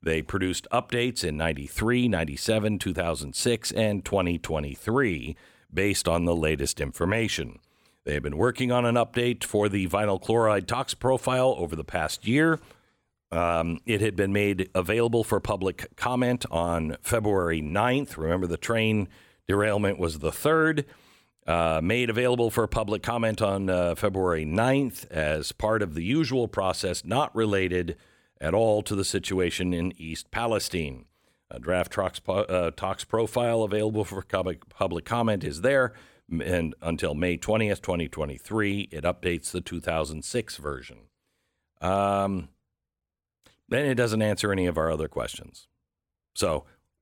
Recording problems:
none

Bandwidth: 17 kHz